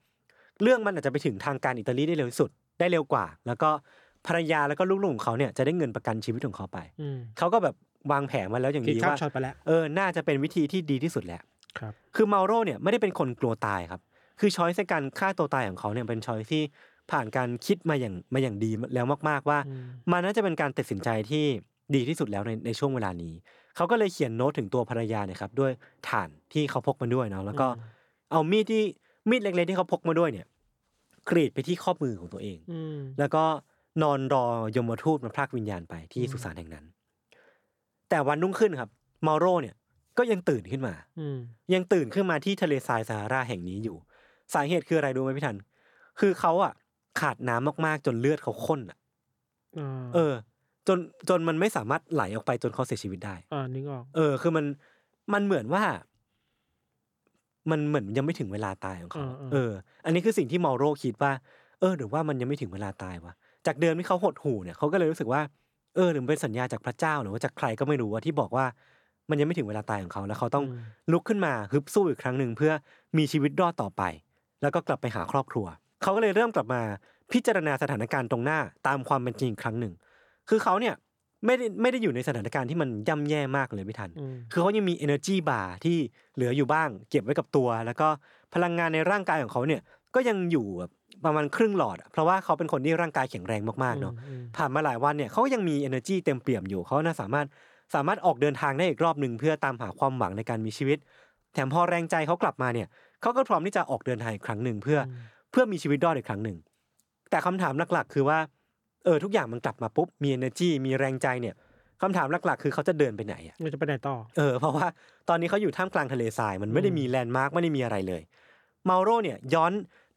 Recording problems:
none

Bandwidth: 18 kHz